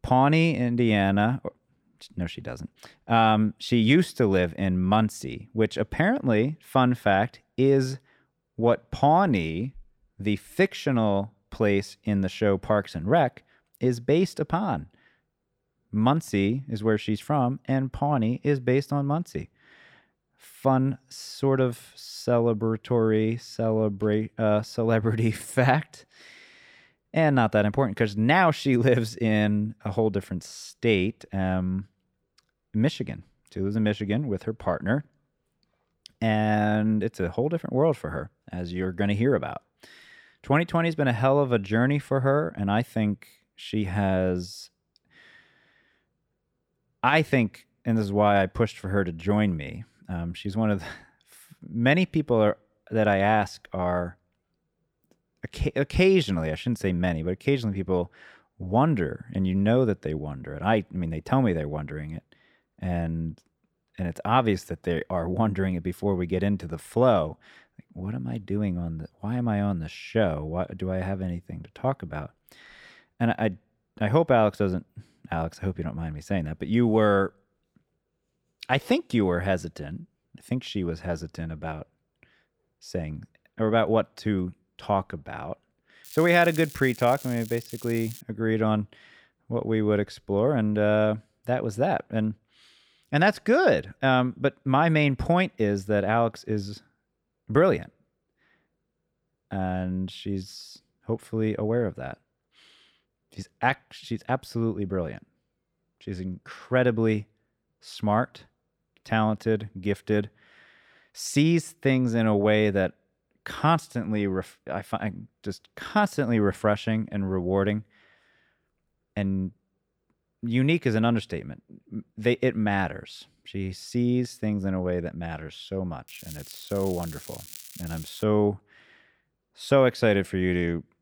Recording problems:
crackling; noticeable; from 1:26 to 1:28 and from 2:06 to 2:08; 15 dB below the speech

